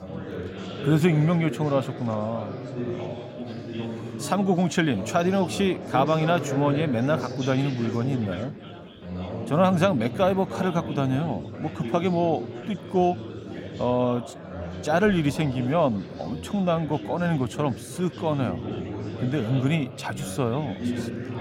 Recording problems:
chatter from many people; loud; throughout; 9 dB below the speech

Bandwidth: 16 kHz